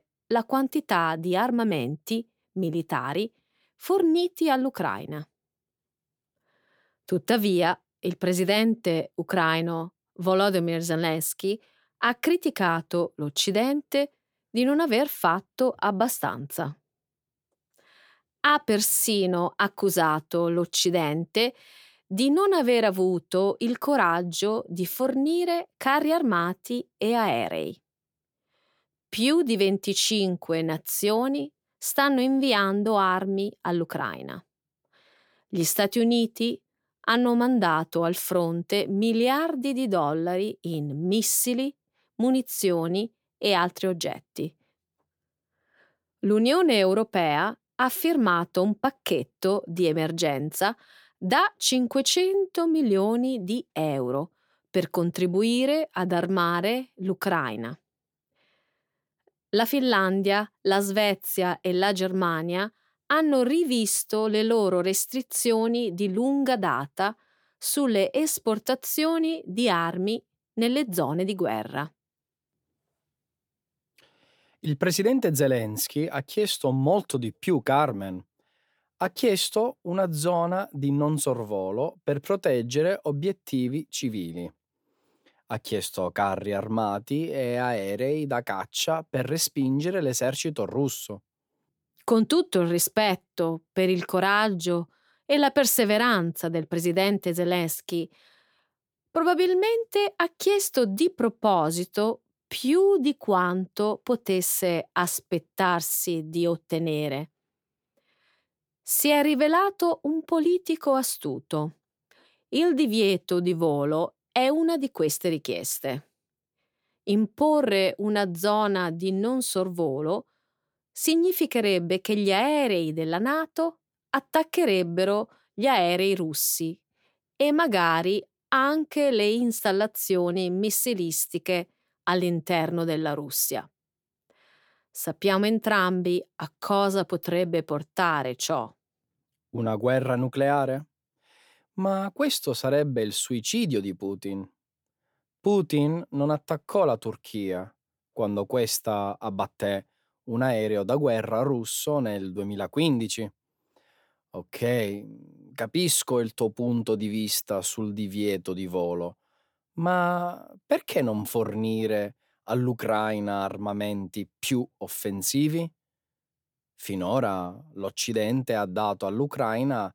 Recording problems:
none

